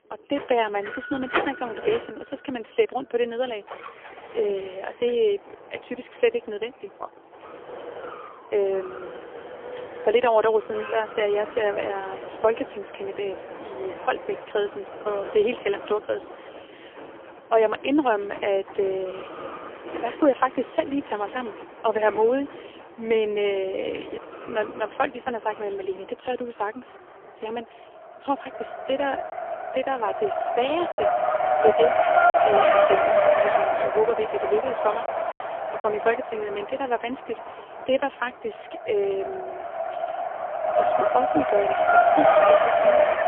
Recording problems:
phone-call audio; poor line; nothing above 3.5 kHz
traffic noise; very loud; throughout; 2 dB above the speech
doorbell; noticeable; from 0.5 to 2.5 s; peak 8 dB below the speech
choppy; very; at 31 s and at 35 s; 5% of the speech affected

